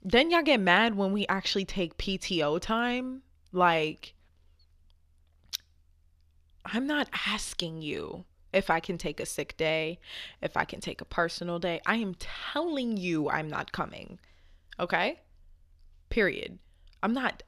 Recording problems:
none

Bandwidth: 14.5 kHz